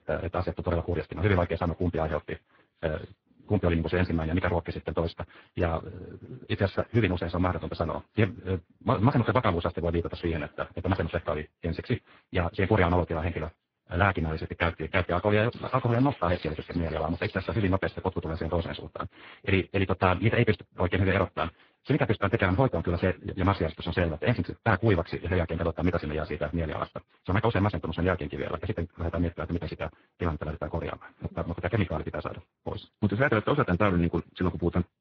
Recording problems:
garbled, watery; badly
wrong speed, natural pitch; too fast; 1.6 times normal speed
muffled; slightly; fading above 3.5 kHz
crackling; noticeable; from 16 to 18 s; 20 dB below the speech

